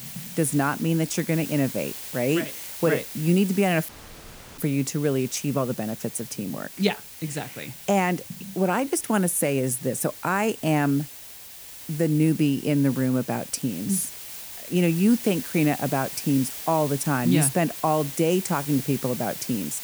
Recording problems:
hiss; noticeable; throughout; 10 dB below the speech
audio cutting out; at 4 s for 0.5 s

